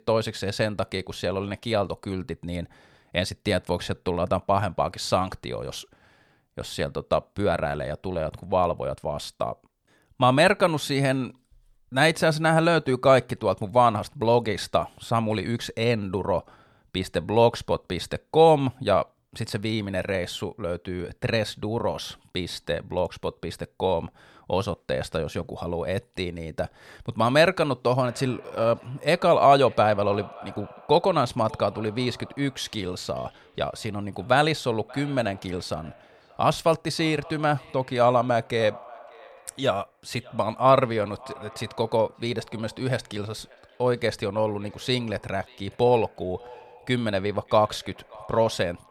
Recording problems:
echo of what is said; faint; from 28 s on; 580 ms later, 20 dB below the speech

